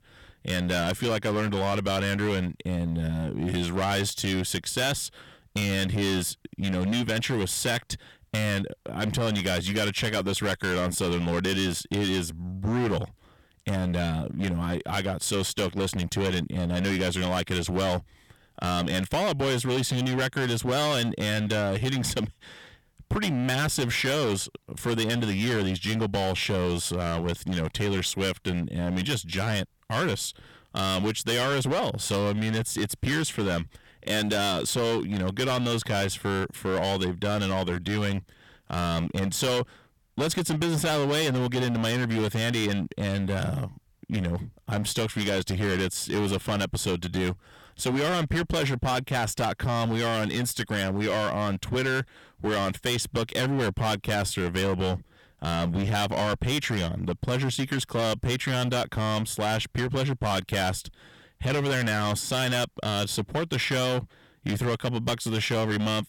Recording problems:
distortion; heavy; 20% of the sound clipped

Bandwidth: 17.5 kHz